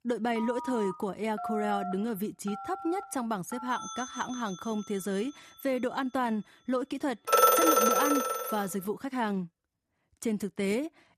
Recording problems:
alarms or sirens; very loud; until 8 s; 4 dB above the speech

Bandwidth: 14 kHz